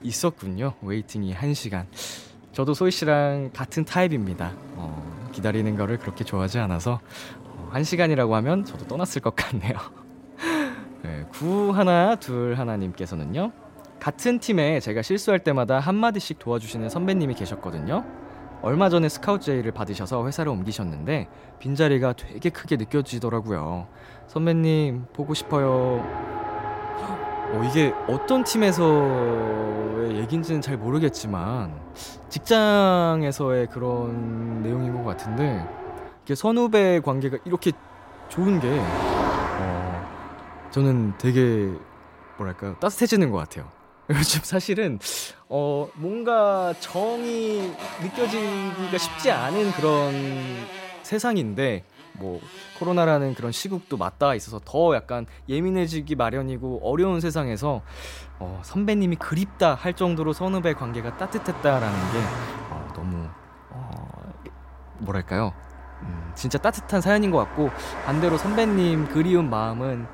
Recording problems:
traffic noise; noticeable; throughout; 10 dB below the speech

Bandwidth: 16 kHz